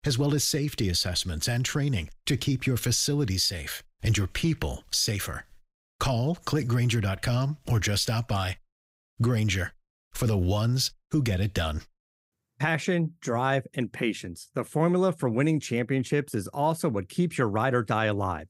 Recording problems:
none

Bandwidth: 15.5 kHz